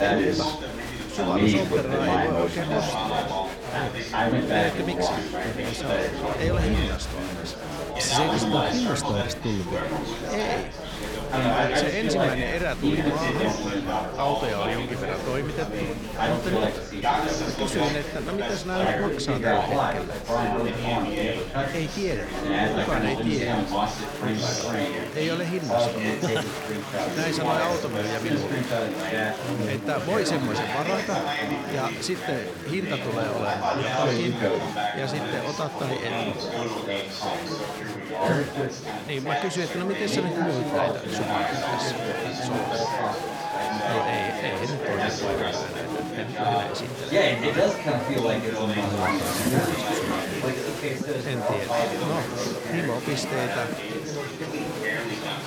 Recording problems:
chatter from many people; very loud; throughout; 4 dB above the speech

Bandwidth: 18.5 kHz